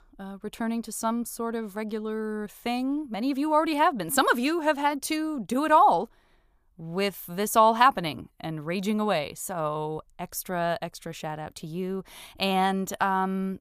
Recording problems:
none

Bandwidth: 15 kHz